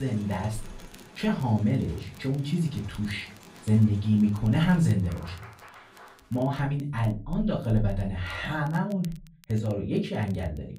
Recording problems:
off-mic speech; far
room echo; slight; dies away in 0.4 s
crowd noise; faint; until 6.5 s; 20 dB below the speech
crackle, like an old record; faint; 30 dB below the speech
abrupt cut into speech; at the start

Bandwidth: 15.5 kHz